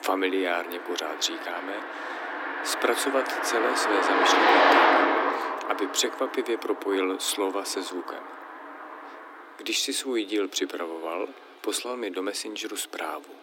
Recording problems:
thin; somewhat; fading below 300 Hz
traffic noise; very loud; throughout; 4 dB above the speech

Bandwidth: 16.5 kHz